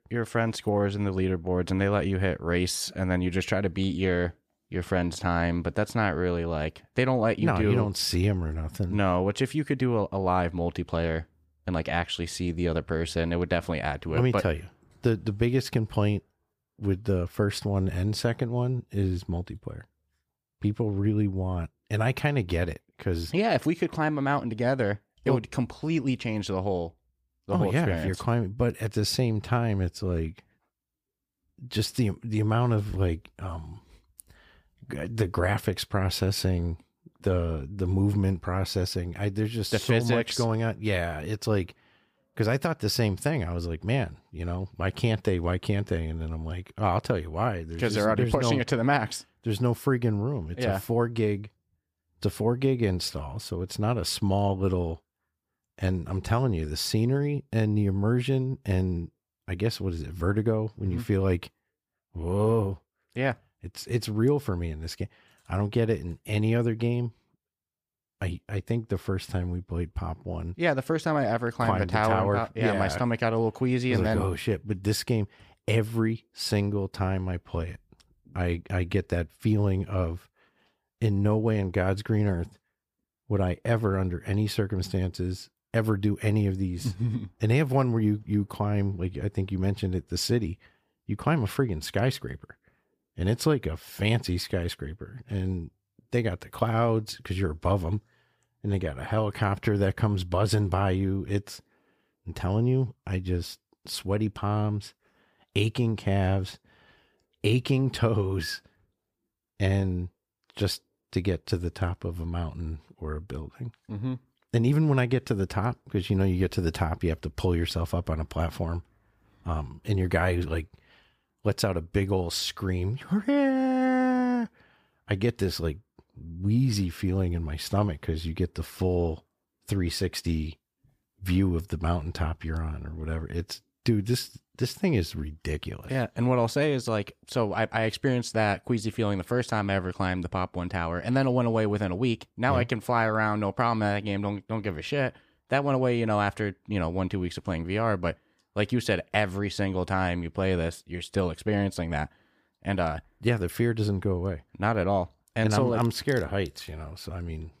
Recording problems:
none

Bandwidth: 15 kHz